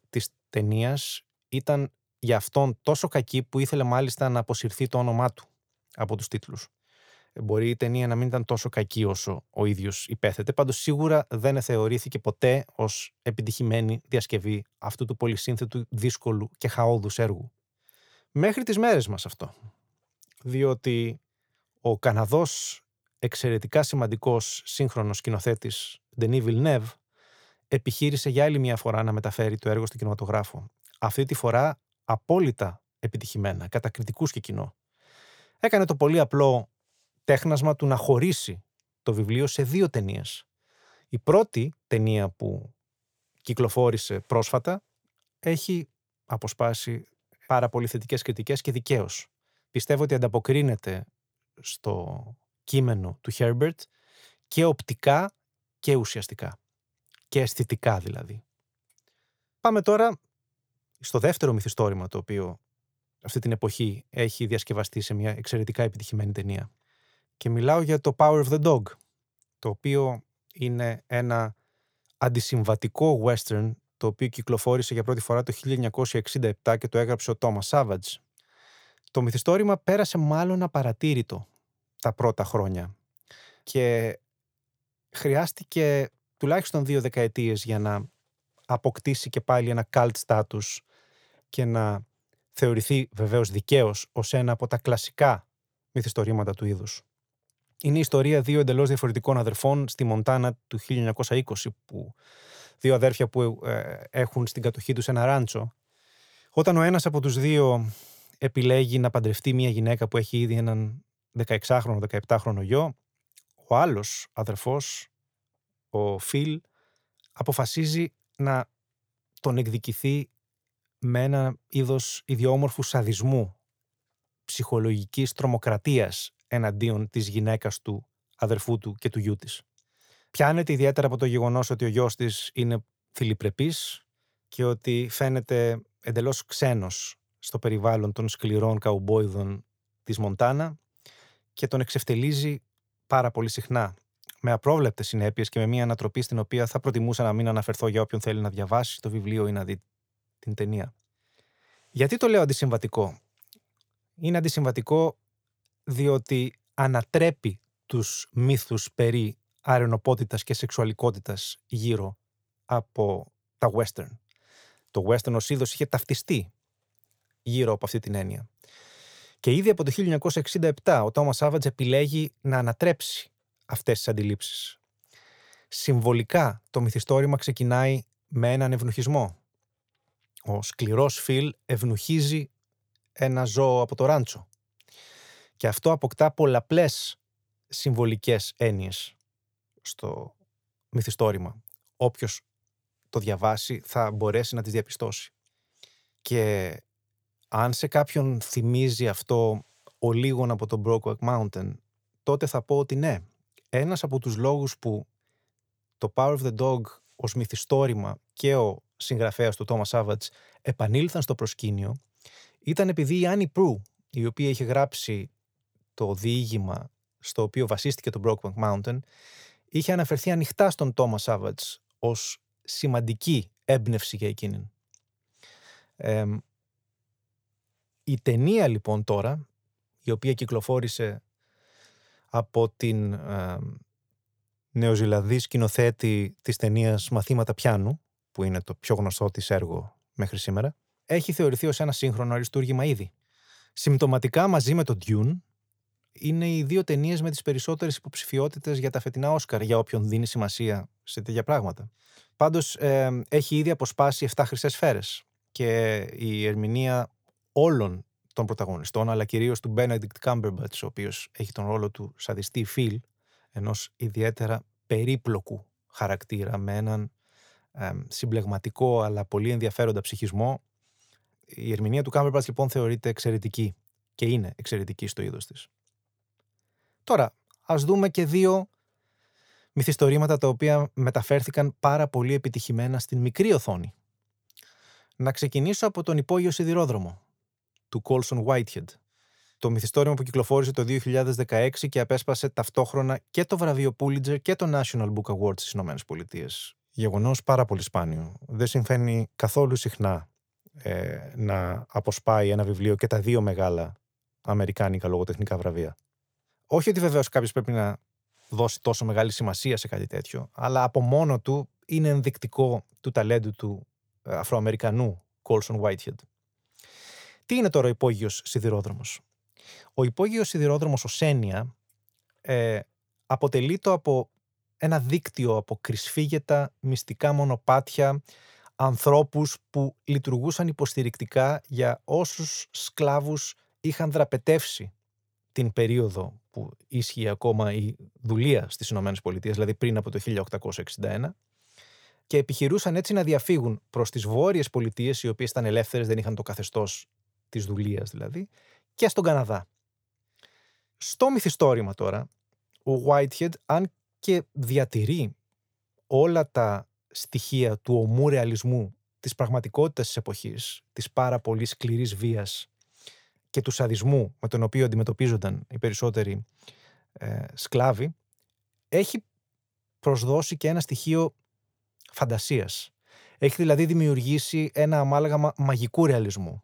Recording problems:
none

